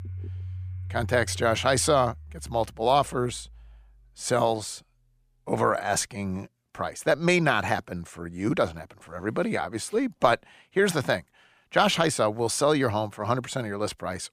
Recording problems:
household noises; noticeable; throughout; 15 dB below the speech

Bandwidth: 15 kHz